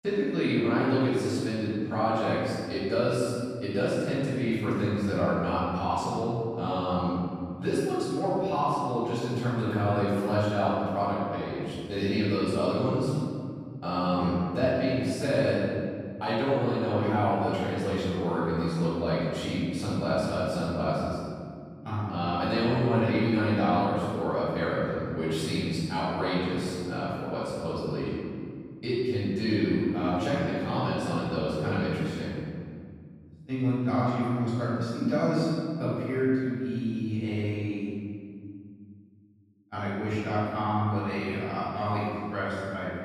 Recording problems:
room echo; strong; dies away in 2.3 s
off-mic speech; far

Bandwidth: 15 kHz